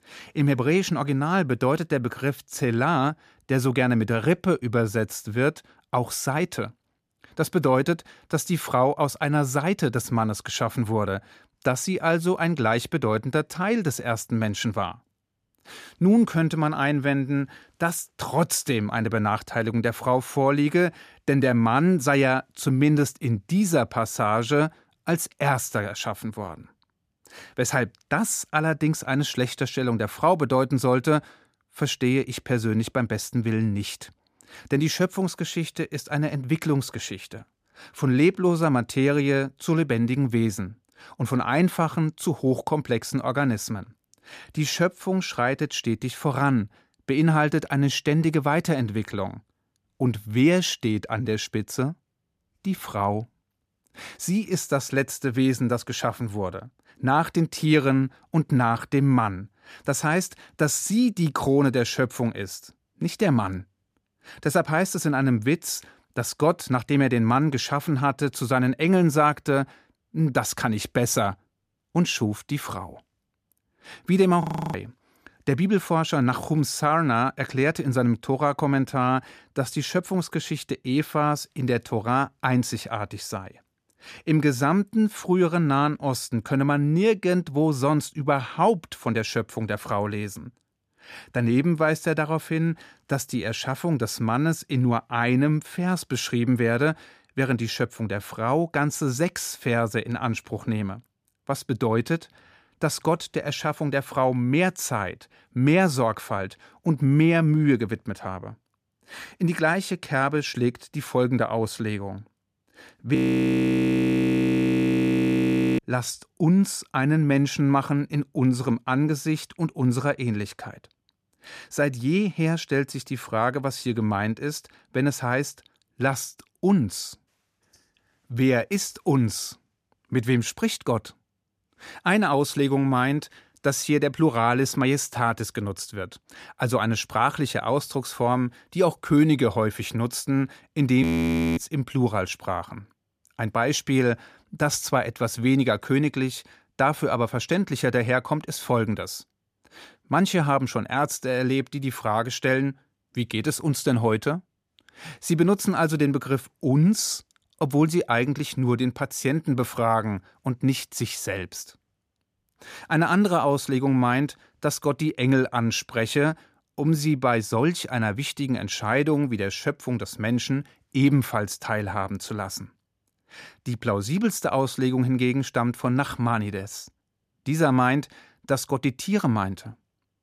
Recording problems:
audio freezing; at 1:14, at 1:53 for 2.5 s and at 2:21 for 0.5 s

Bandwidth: 15 kHz